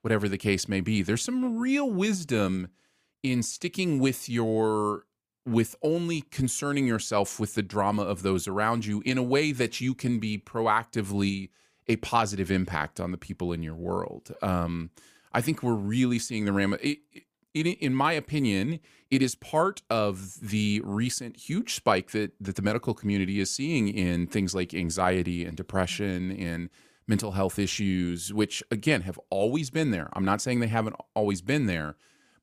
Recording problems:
none

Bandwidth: 15 kHz